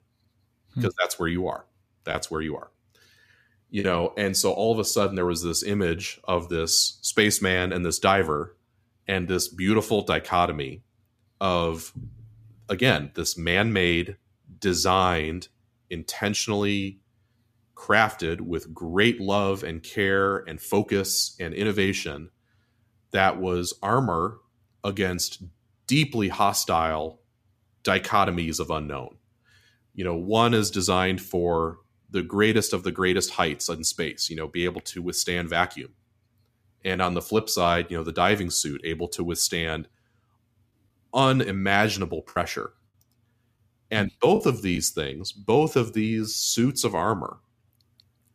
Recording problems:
choppy; occasionally; from 2 to 4 s and from 42 to 45 s; 4% of the speech affected

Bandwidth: 14.5 kHz